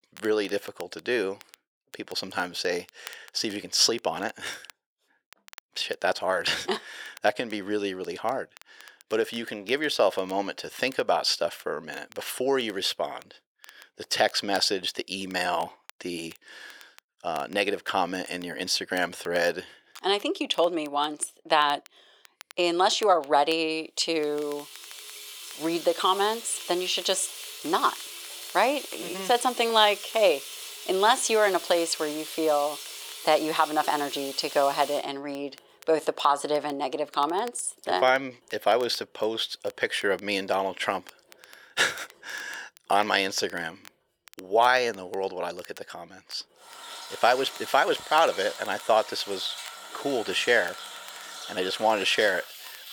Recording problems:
thin; very; fading below 550 Hz
household noises; noticeable; from 25 s on; 10 dB below the speech
crackle, like an old record; faint; 25 dB below the speech

